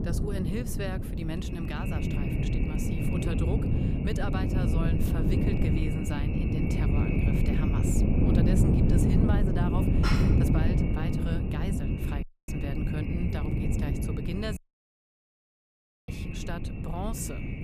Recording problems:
echo of what is said; strong; throughout; 410 ms later, 10 dB below the speech
wind noise on the microphone; heavy; 3 dB above the speech
clattering dishes; loud; at 10 s; peak 3 dB above the speech
audio cutting out; at 12 s and at 15 s for 1.5 s

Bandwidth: 15 kHz